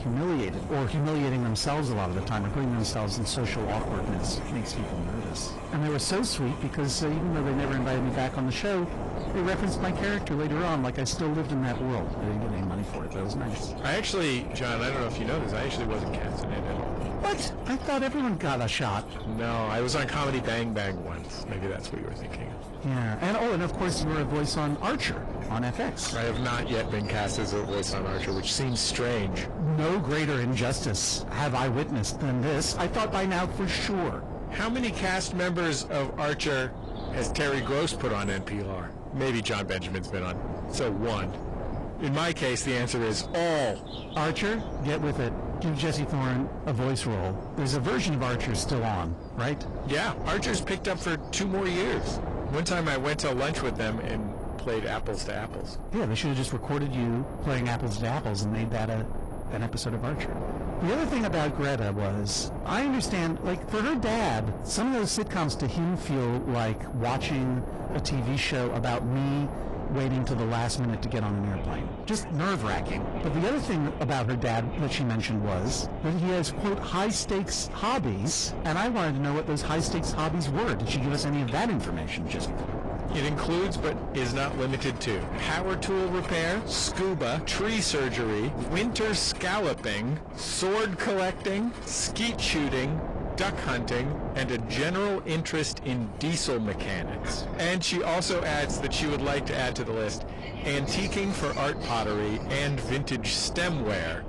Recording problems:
distortion; heavy; 6 dB below the speech
garbled, watery; slightly; nothing above 10.5 kHz
wind noise on the microphone; heavy; 9 dB below the speech
animal sounds; noticeable; throughout; 20 dB below the speech

